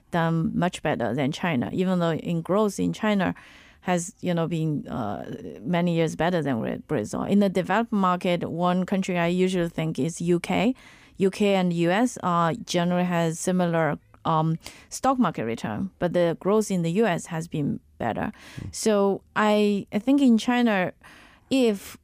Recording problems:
none

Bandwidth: 15 kHz